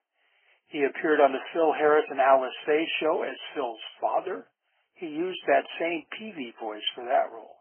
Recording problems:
garbled, watery; badly
thin; very; fading below 300 Hz
high frequencies cut off; severe; nothing above 3 kHz

